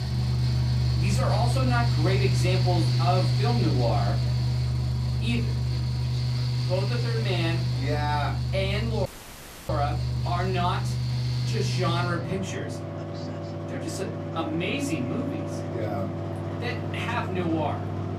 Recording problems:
off-mic speech; far
room echo; very slight; dies away in 0.3 s
machinery noise; very loud; throughout; 3 dB above the speech
voice in the background; faint; throughout; 20 dB below the speech
audio cutting out; filled with static; at 9 s for 0.5 s

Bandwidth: 14.5 kHz